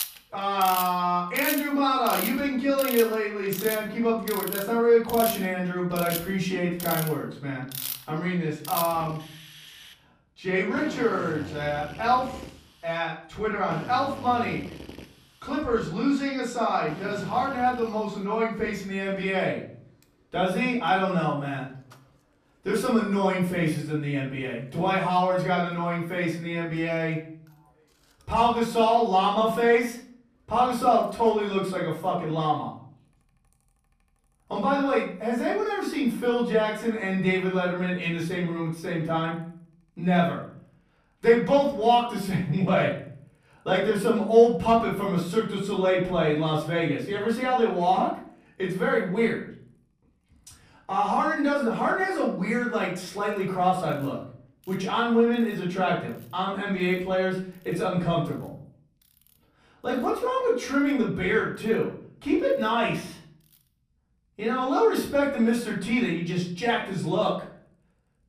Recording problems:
off-mic speech; far
room echo; noticeable; dies away in 0.5 s
machinery noise; noticeable; throughout; 10 dB below the speech

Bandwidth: 14.5 kHz